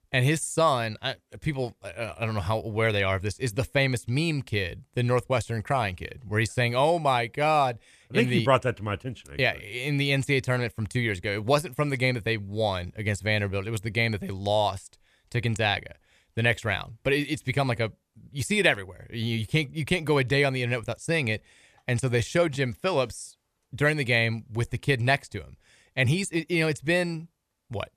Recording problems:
none

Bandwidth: 14.5 kHz